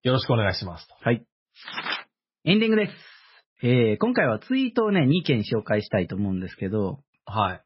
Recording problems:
garbled, watery; badly; nothing above 5.5 kHz

